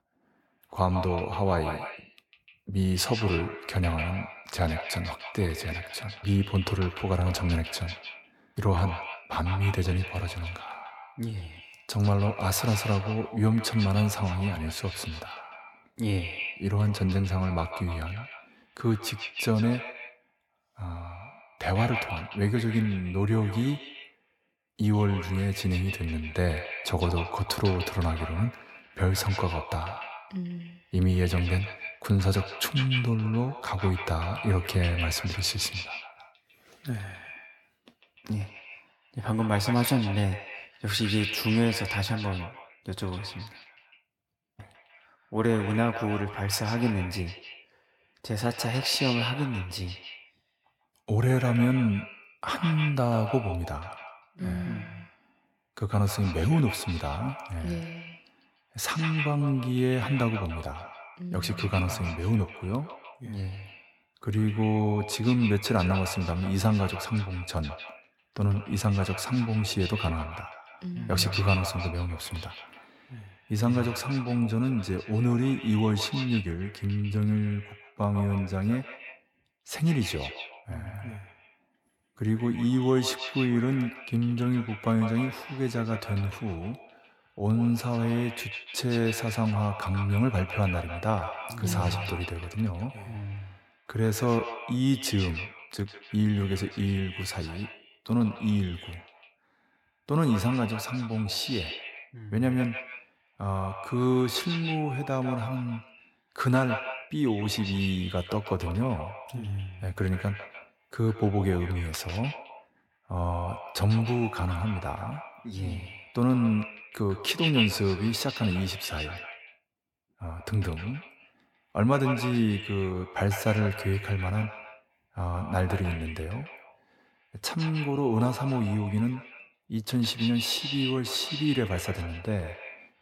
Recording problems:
echo of what is said; strong; throughout; 150 ms later, 9 dB below the speech

